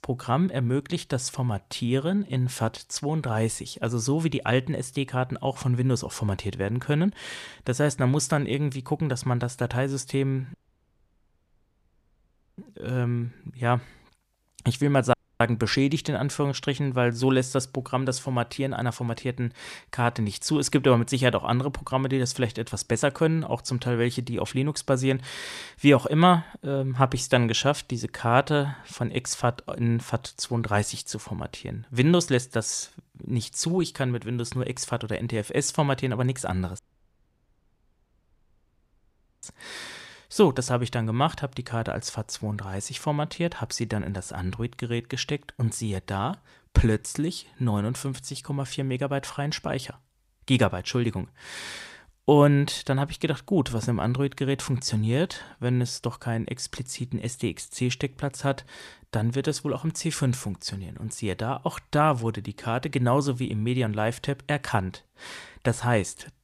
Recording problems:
audio cutting out; at 11 s for 2 s, at 15 s and at 37 s for 2.5 s

